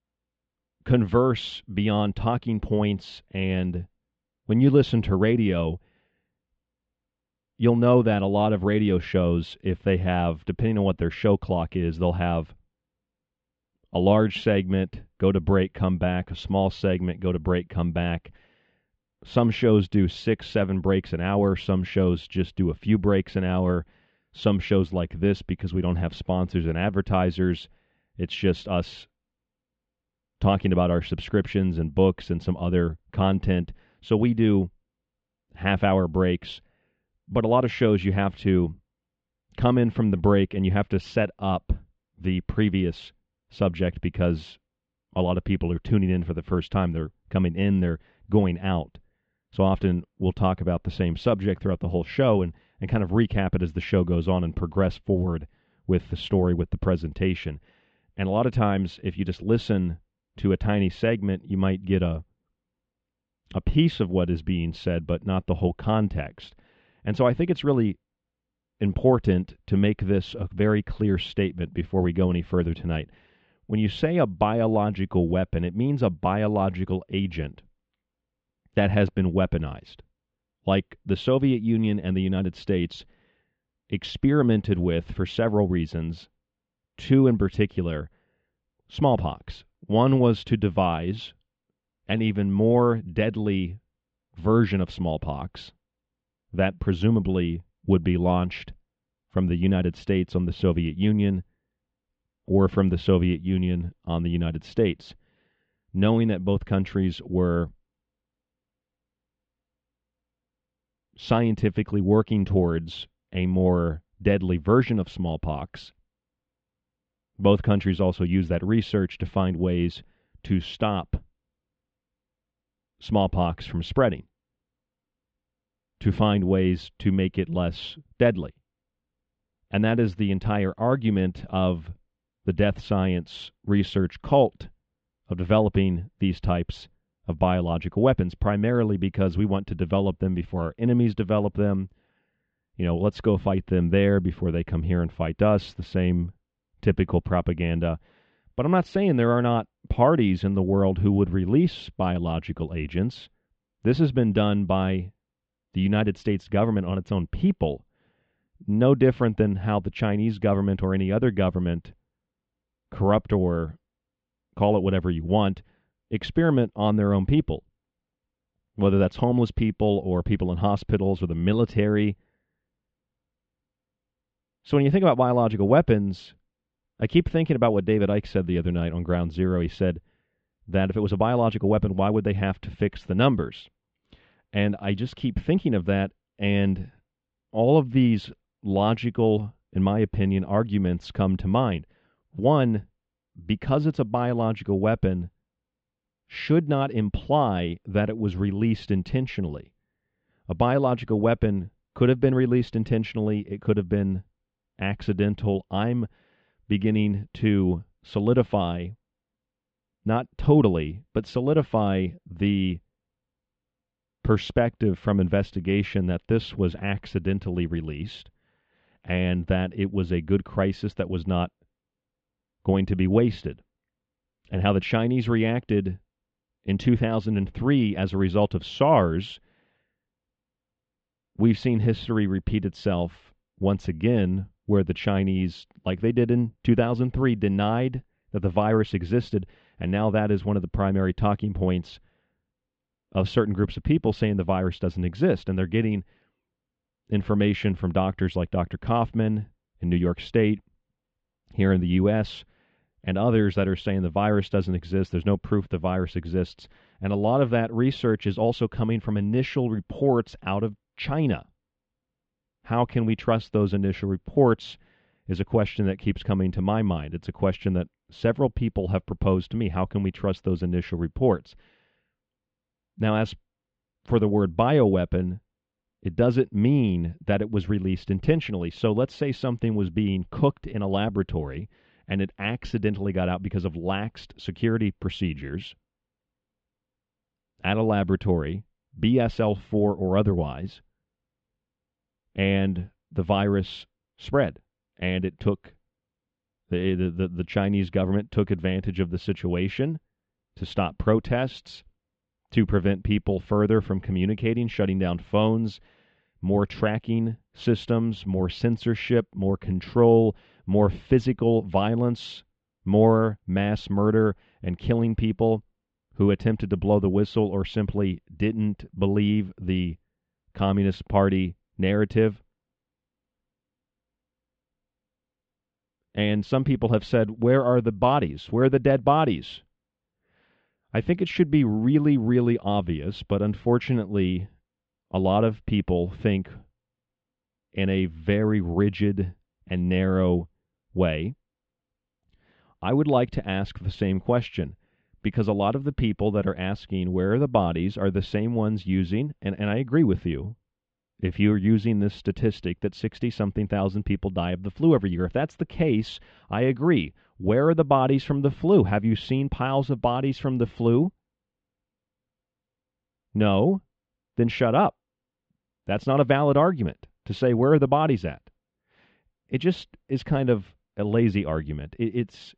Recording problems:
muffled; slightly; fading above 3.5 kHz
high frequencies cut off; slight; nothing above 8 kHz

